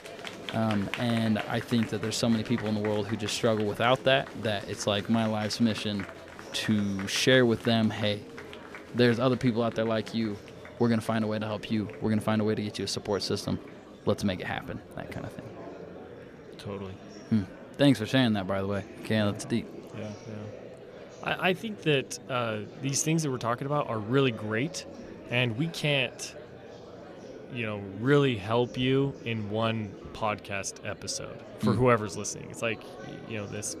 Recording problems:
murmuring crowd; noticeable; throughout; 15 dB below the speech

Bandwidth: 14.5 kHz